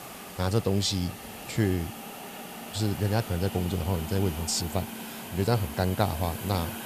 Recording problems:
hiss; loud; throughout; 10 dB below the speech

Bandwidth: 14.5 kHz